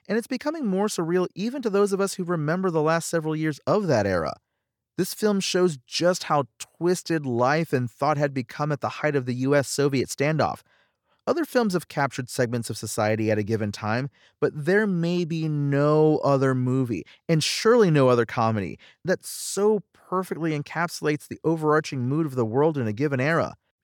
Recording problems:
none

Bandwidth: 18 kHz